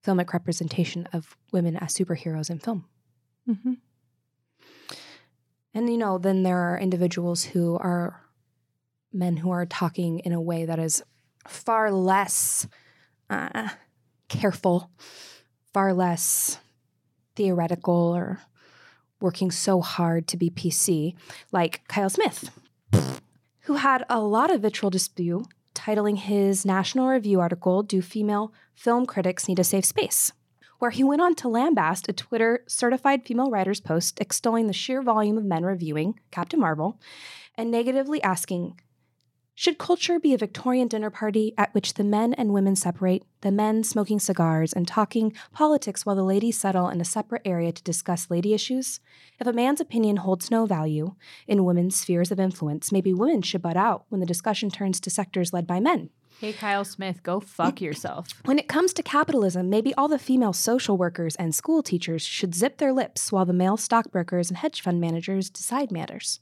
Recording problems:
none

